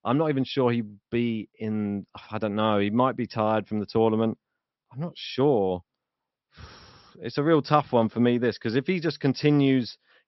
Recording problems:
high frequencies cut off; noticeable; nothing above 5.5 kHz

